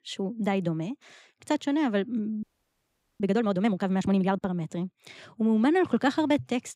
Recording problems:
audio freezing; at 2.5 s for 1 s

